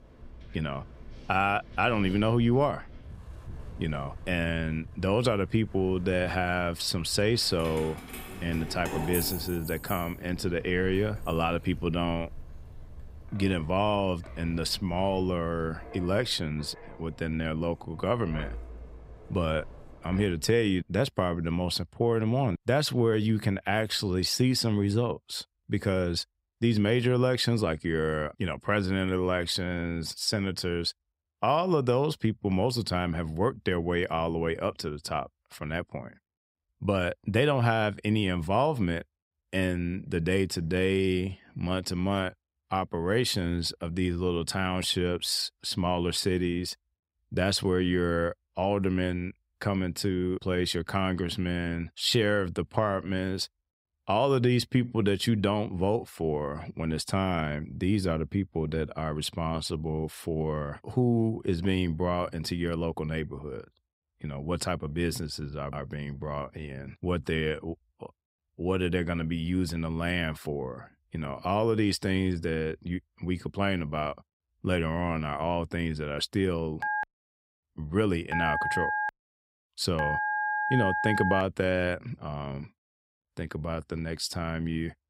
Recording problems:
wind in the background; noticeable; until 20 s; 20 dB below the speech
jangling keys; noticeable; from 7.5 to 12 s; peak 3 dB below the speech
phone ringing; loud; from 1:17 to 1:21; peak 1 dB above the speech

